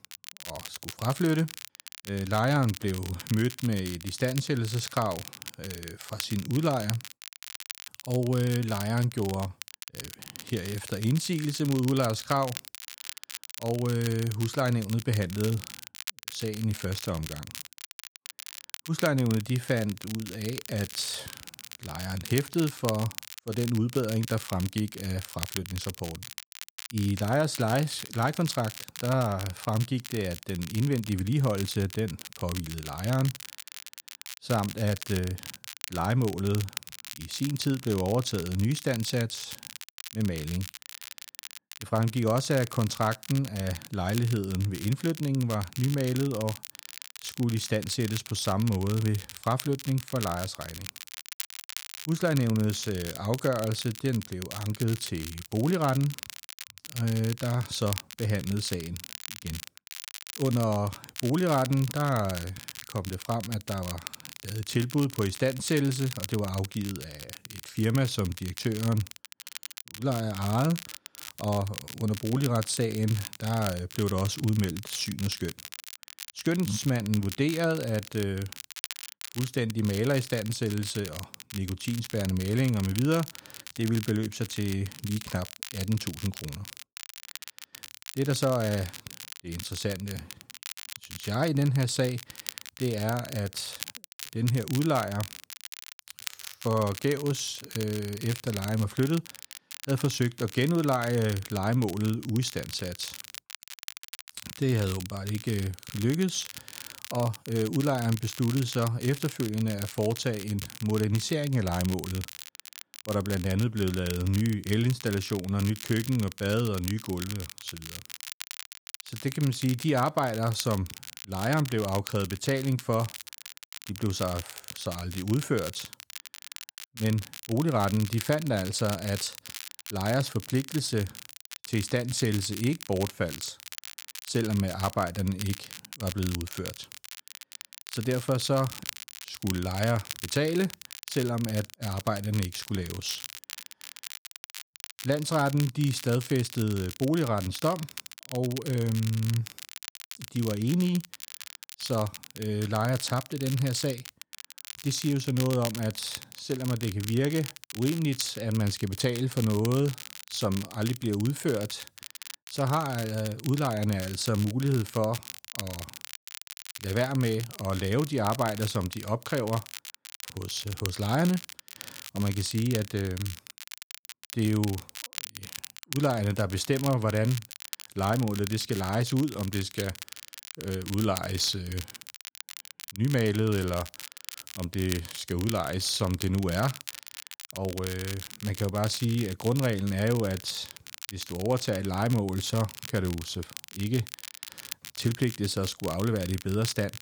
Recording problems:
crackle, like an old record; noticeable; 10 dB below the speech

